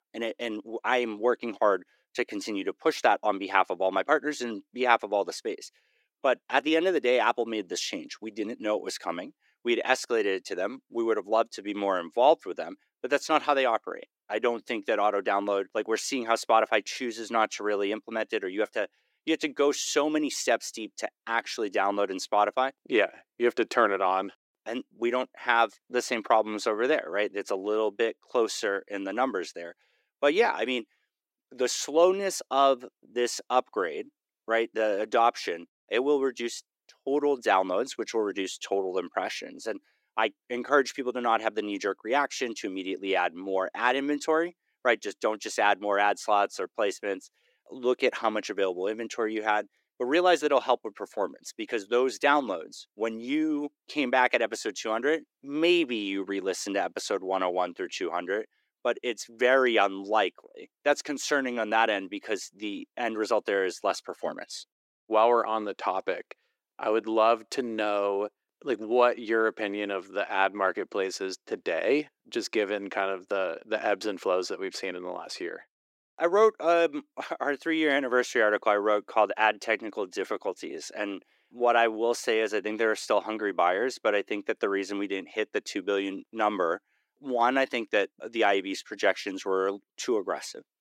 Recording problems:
thin; somewhat; fading below 350 Hz

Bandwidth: 16 kHz